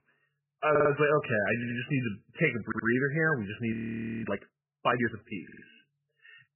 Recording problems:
garbled, watery; badly; nothing above 3 kHz
audio stuttering; 4 times, first at 0.5 s
audio freezing; at 3.5 s for 0.5 s

